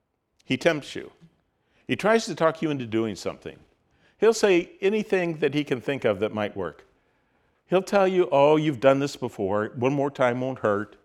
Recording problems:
none

